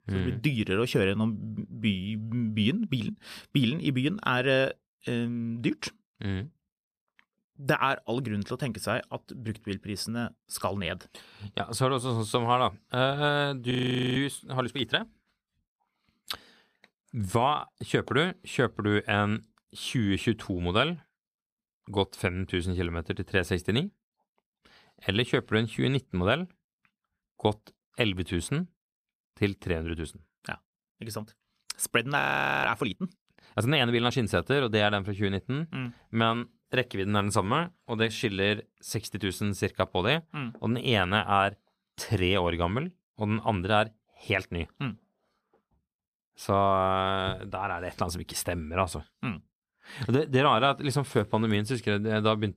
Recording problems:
audio freezing; at 14 s and at 32 s

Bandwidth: 14.5 kHz